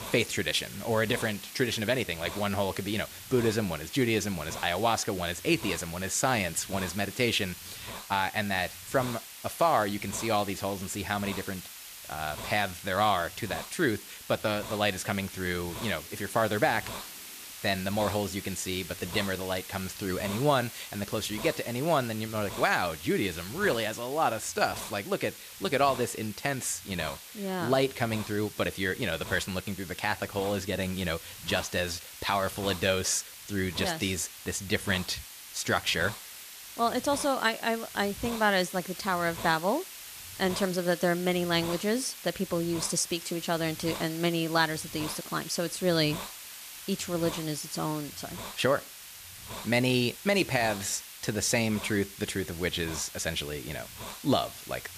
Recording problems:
hiss; noticeable; throughout; 10 dB below the speech

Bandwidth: 14.5 kHz